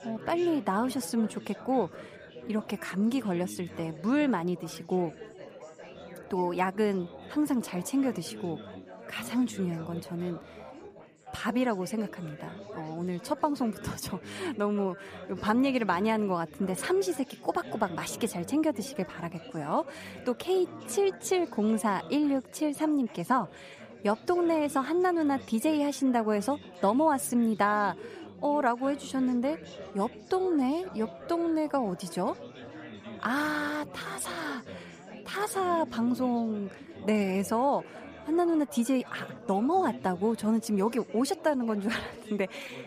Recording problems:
chatter from many people; noticeable; throughout; 15 dB below the speech

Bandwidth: 15 kHz